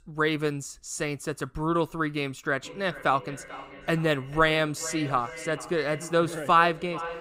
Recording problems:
echo of what is said; noticeable; from 2.5 s on; 440 ms later, 15 dB below the speech

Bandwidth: 15.5 kHz